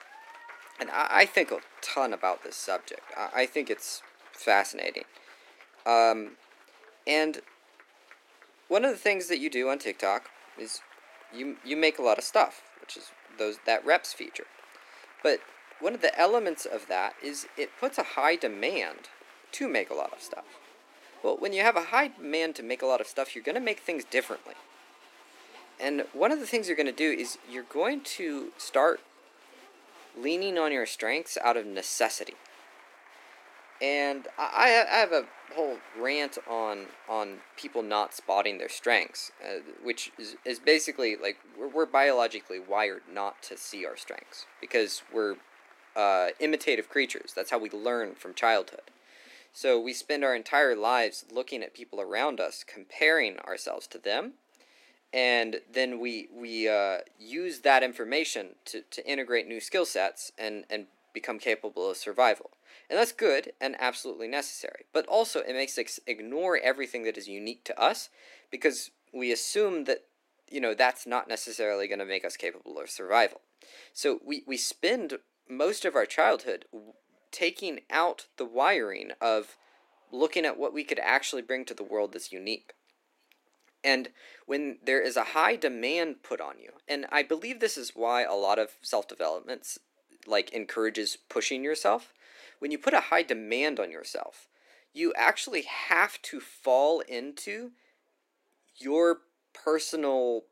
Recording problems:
thin; somewhat; fading below 300 Hz
crowd noise; faint; throughout; 25 dB below the speech

